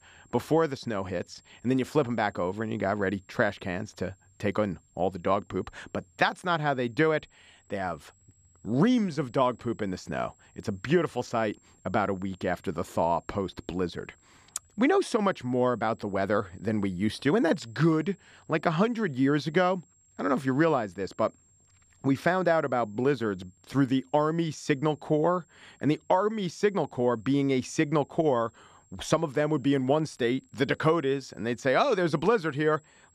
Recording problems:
high-pitched whine; faint; throughout; 7.5 kHz, 35 dB below the speech

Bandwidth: 15 kHz